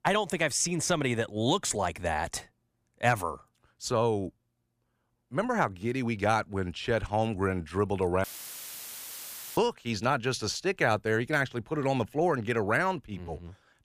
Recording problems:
audio cutting out; filled with static; at 8 s for 1.5 s

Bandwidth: 15 kHz